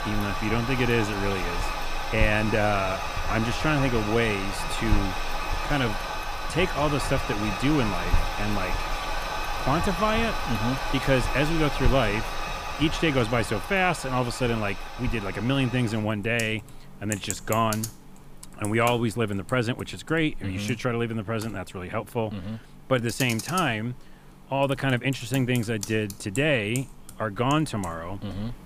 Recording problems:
household noises; loud; throughout; 5 dB below the speech

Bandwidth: 15 kHz